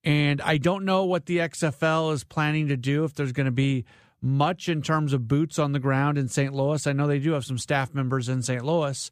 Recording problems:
none

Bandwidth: 15 kHz